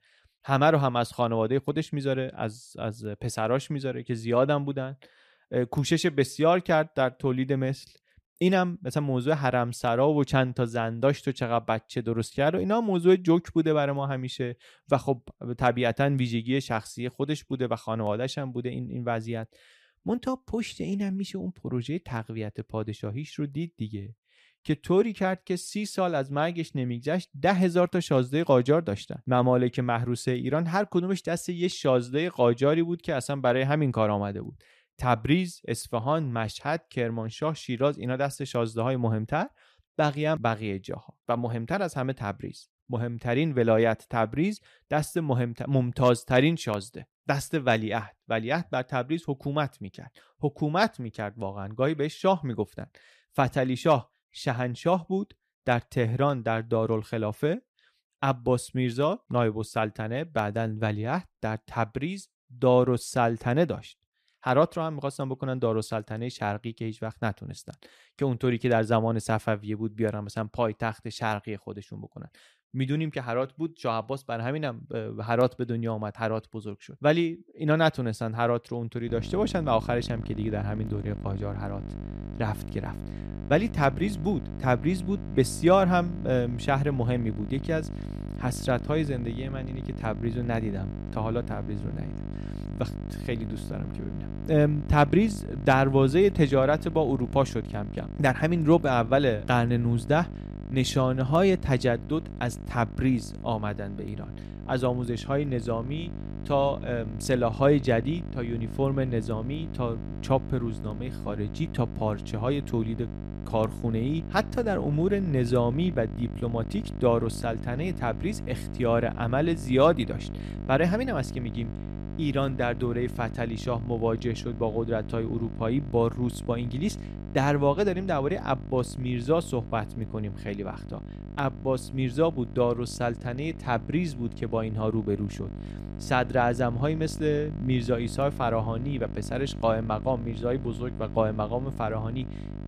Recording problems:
electrical hum; noticeable; from 1:19 on; 50 Hz, 15 dB below the speech

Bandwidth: 14.5 kHz